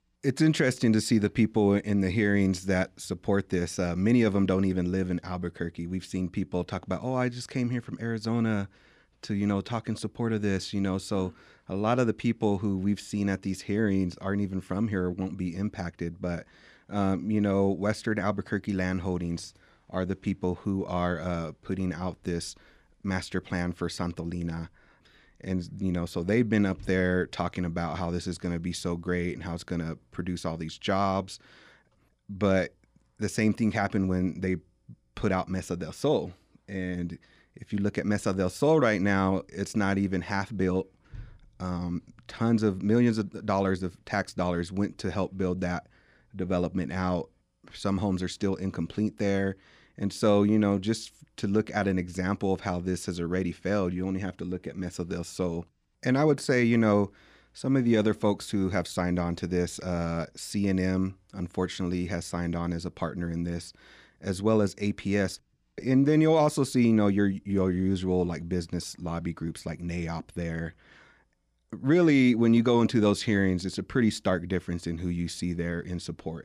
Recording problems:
none

